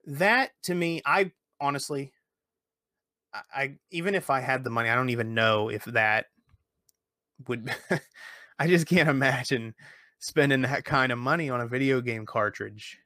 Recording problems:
none

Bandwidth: 15 kHz